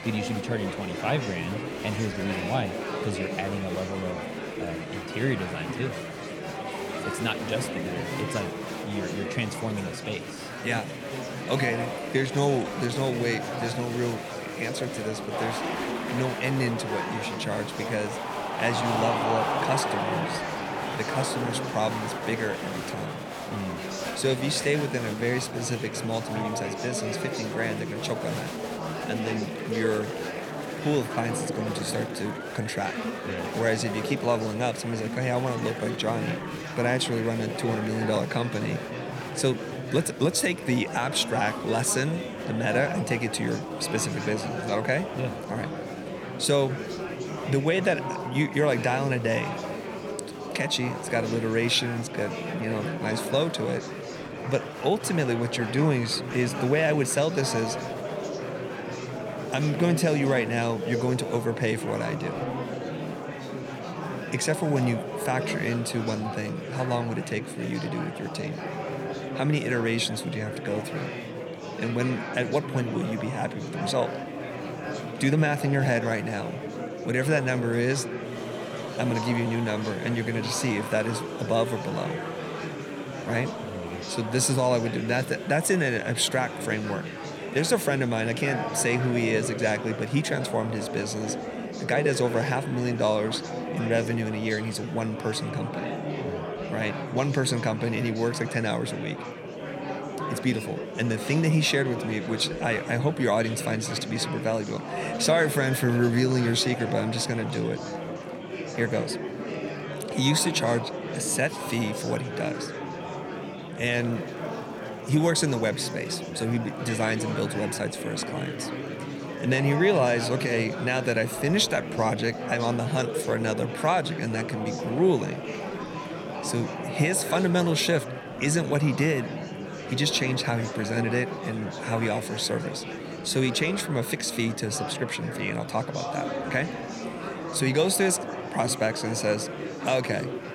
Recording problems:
murmuring crowd; loud; throughout; 6 dB below the speech

